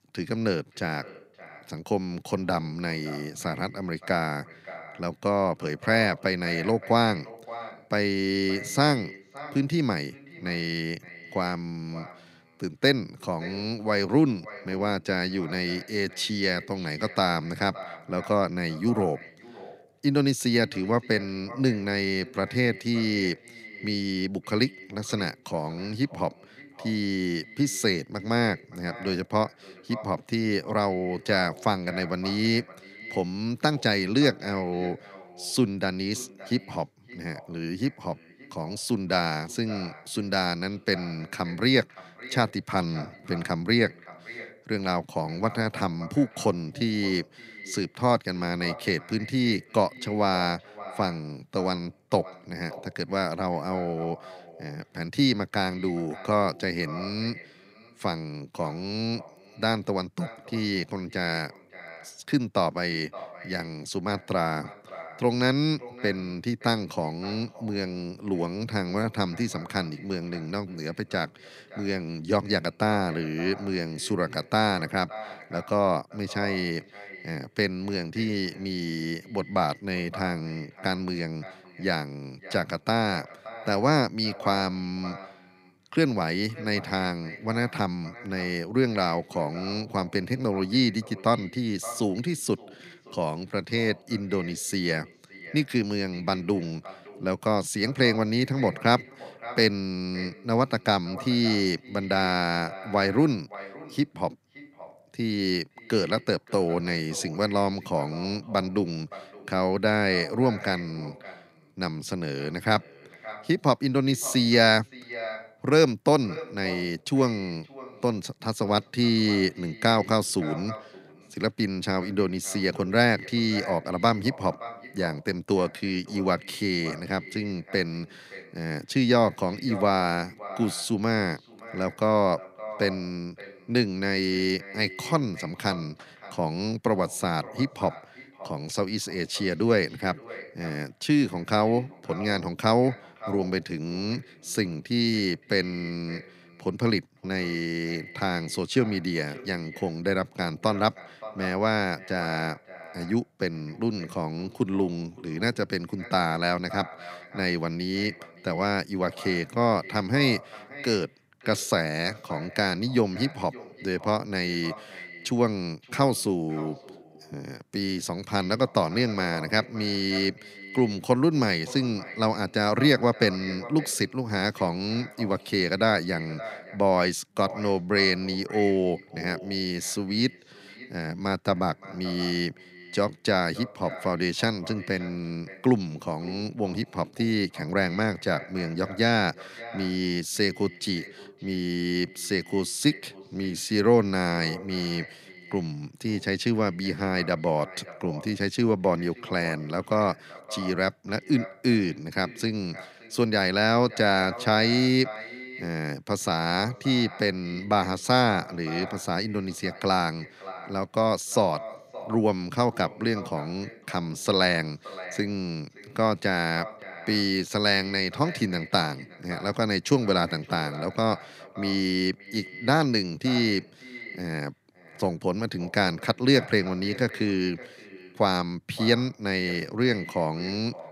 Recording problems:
echo of what is said; noticeable; throughout; 570 ms later, 15 dB below the speech

